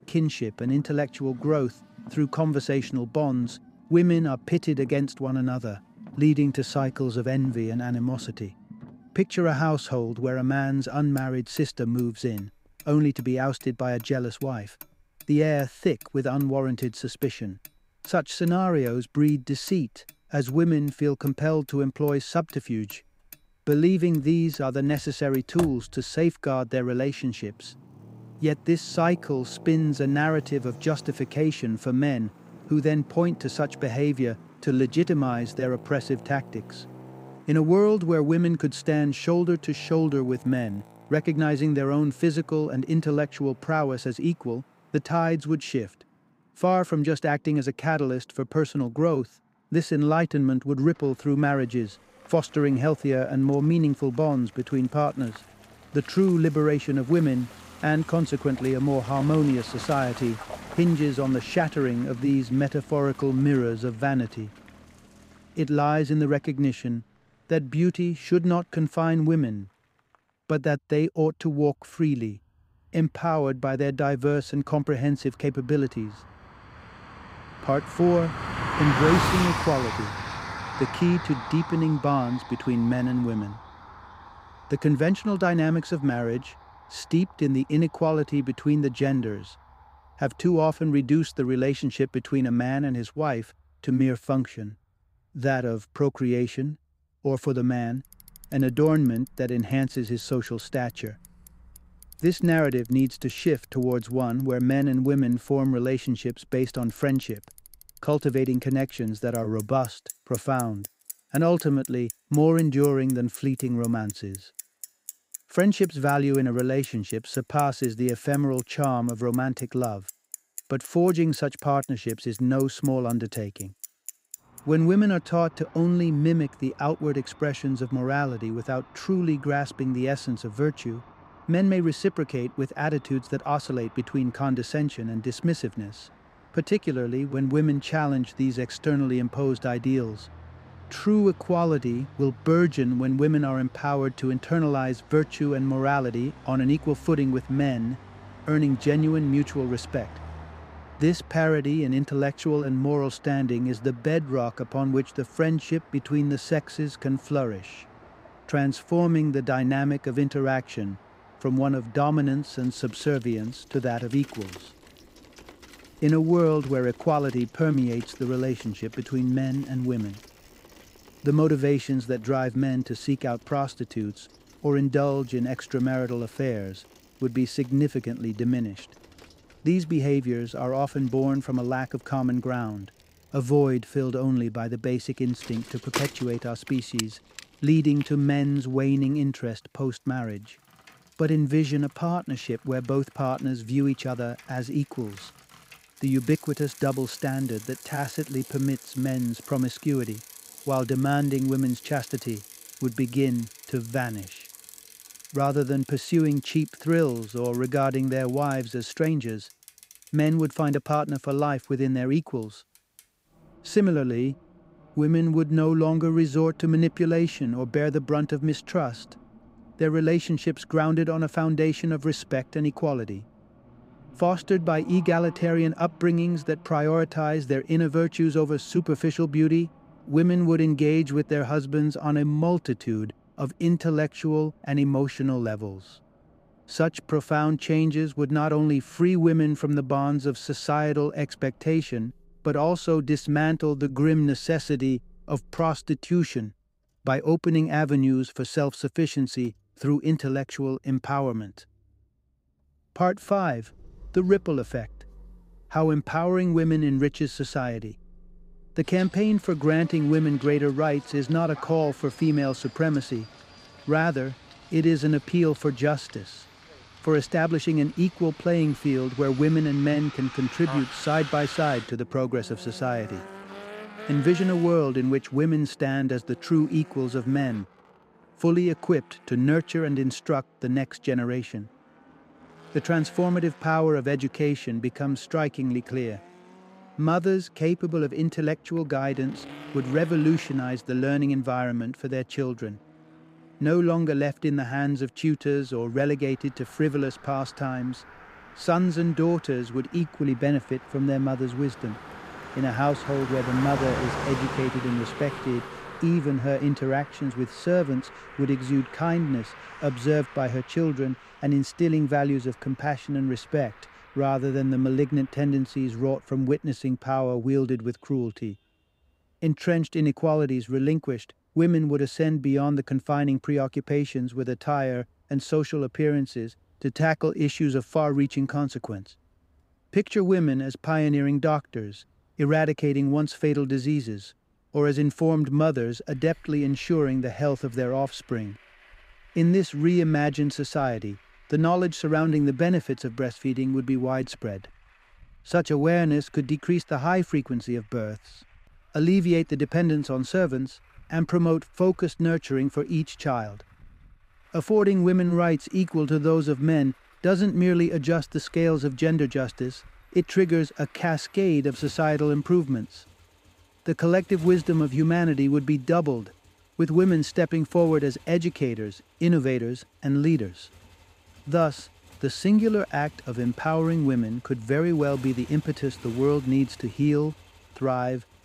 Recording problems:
traffic noise; noticeable; throughout; 15 dB below the speech

